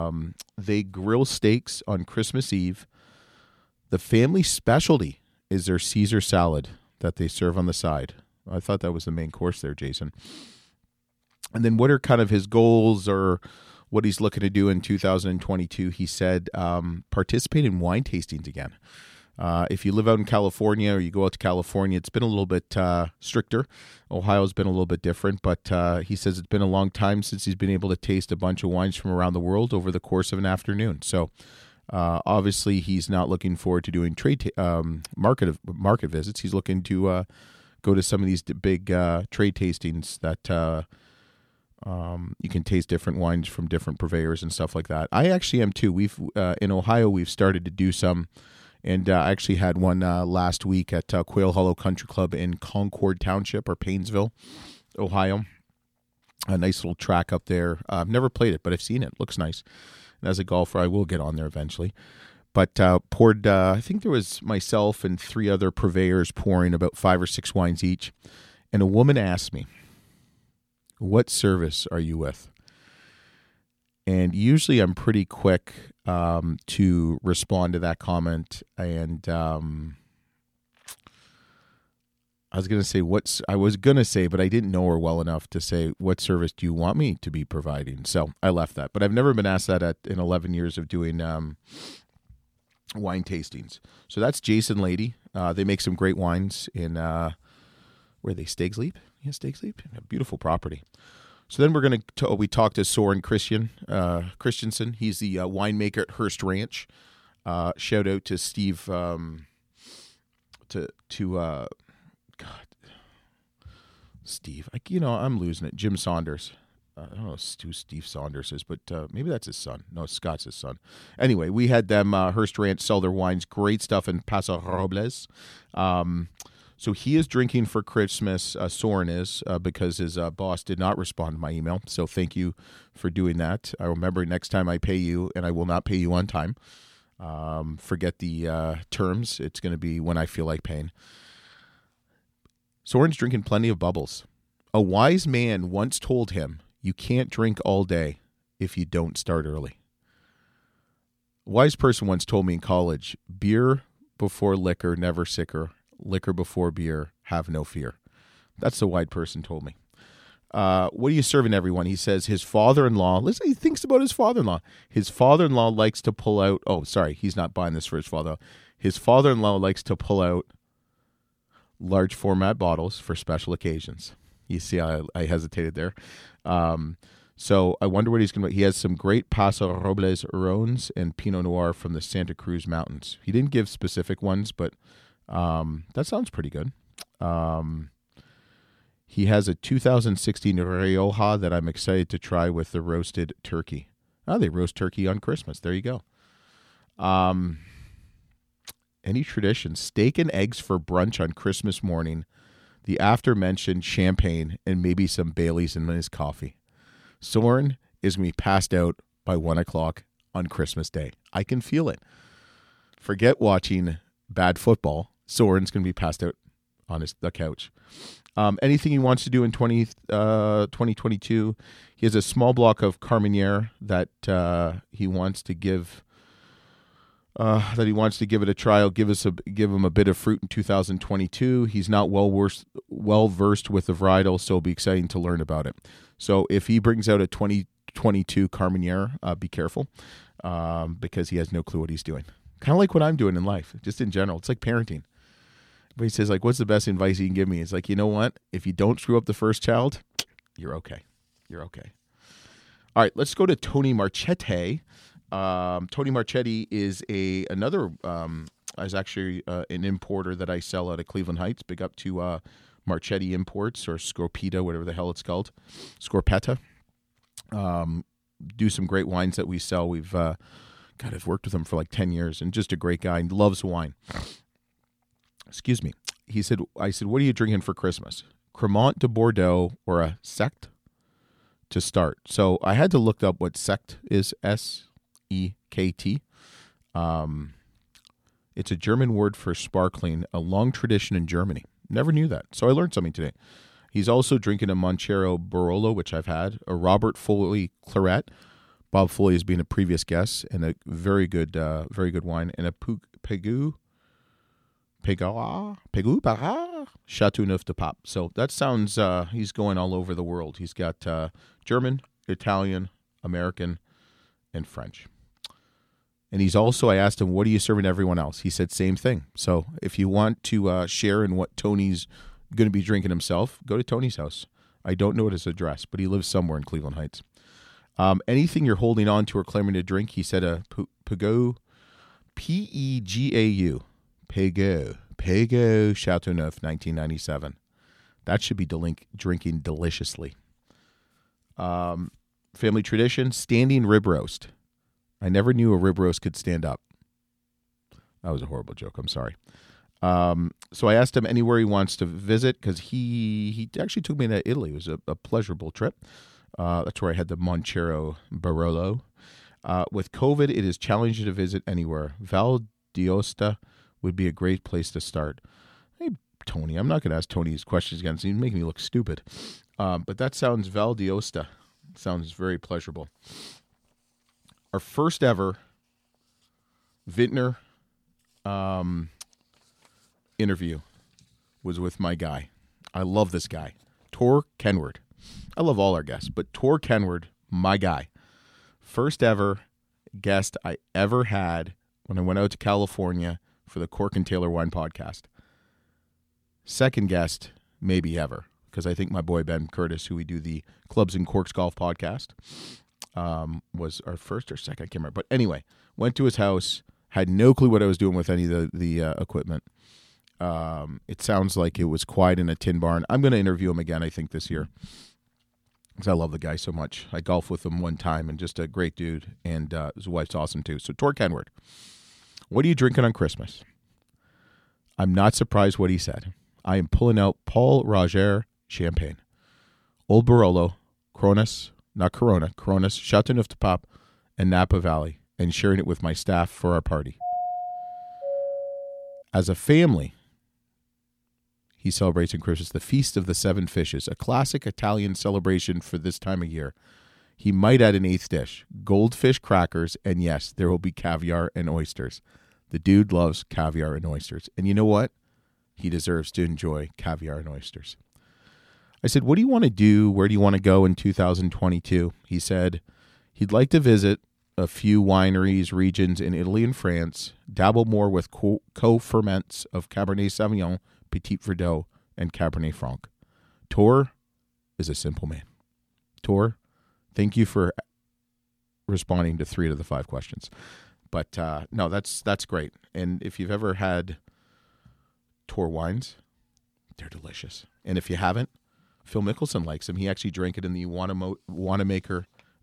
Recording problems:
abrupt cut into speech; at the start
doorbell; noticeable; from 7:17 to 7:19; peak 4 dB below the speech

